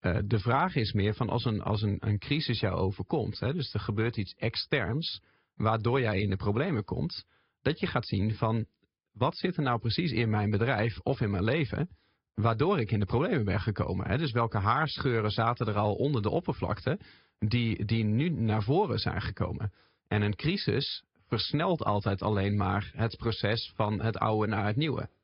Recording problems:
high frequencies cut off; noticeable; nothing above 5 kHz
garbled, watery; slightly

